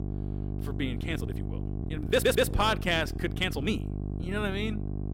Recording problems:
electrical hum; noticeable; throughout; 50 Hz, 15 dB below the speech
uneven, jittery; strongly; from 1 to 4.5 s
audio stuttering; at 2 s

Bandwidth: 16 kHz